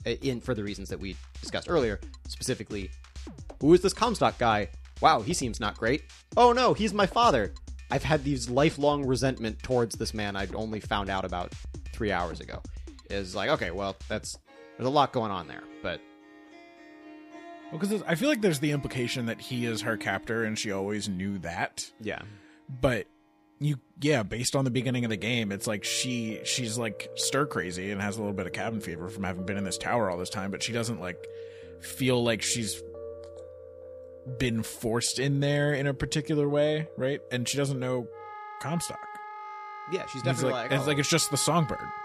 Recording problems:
background music; noticeable; throughout; 15 dB below the speech

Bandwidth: 15 kHz